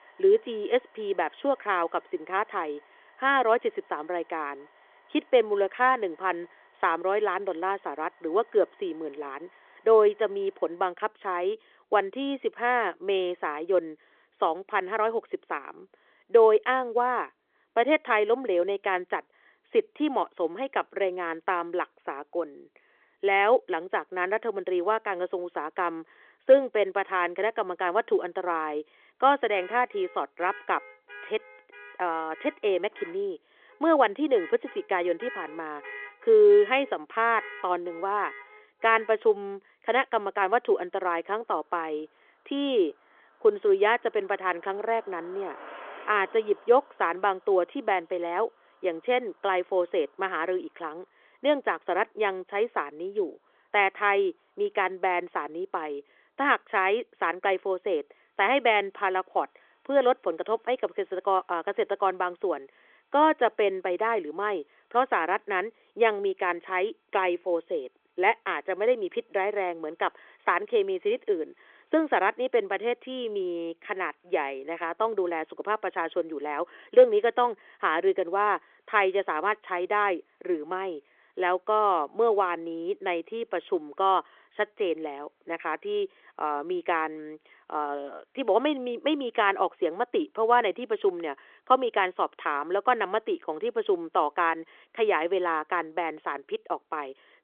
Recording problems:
phone-call audio; nothing above 3.5 kHz
traffic noise; faint; throughout; 20 dB below the speech

